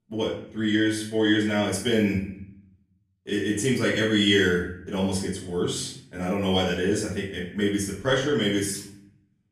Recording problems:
off-mic speech; far
room echo; noticeable; dies away in 0.7 s

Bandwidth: 15 kHz